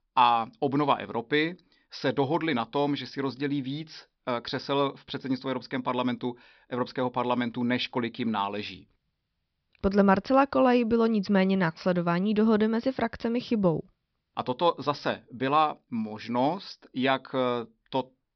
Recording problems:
high frequencies cut off; noticeable; nothing above 5.5 kHz

